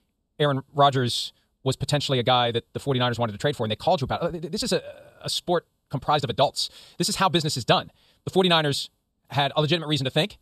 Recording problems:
wrong speed, natural pitch; too fast; 1.7 times normal speed

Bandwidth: 14.5 kHz